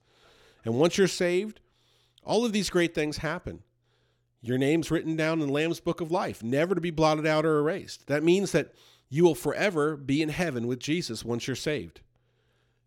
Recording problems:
none

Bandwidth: 17 kHz